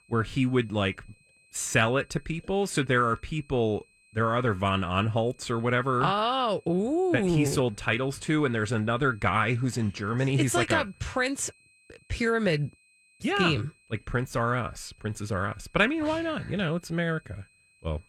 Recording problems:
high-pitched whine; faint; throughout; 2.5 kHz, 30 dB below the speech

